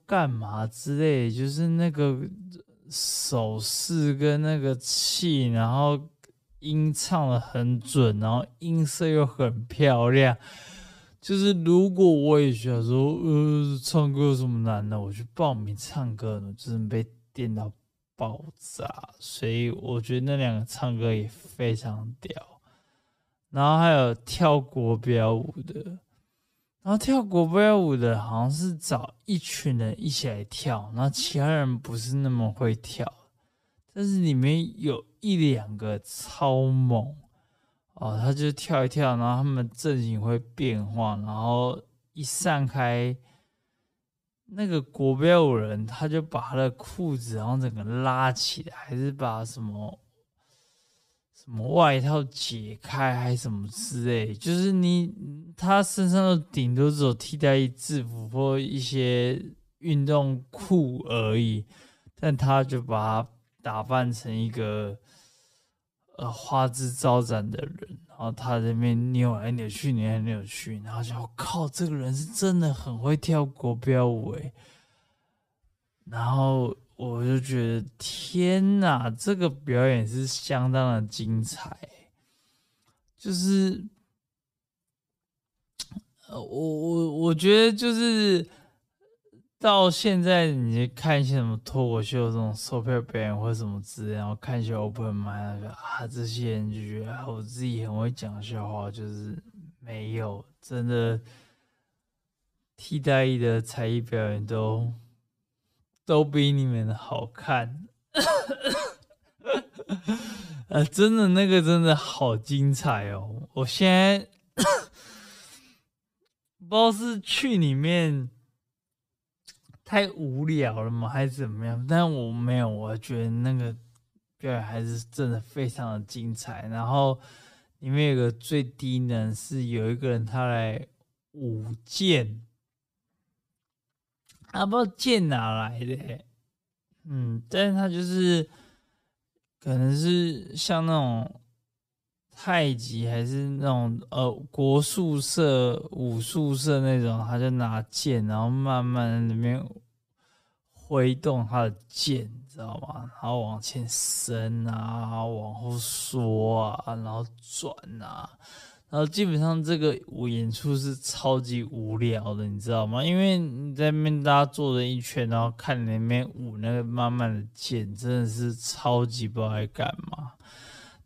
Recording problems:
wrong speed, natural pitch; too slow; 0.6 times normal speed

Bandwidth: 15 kHz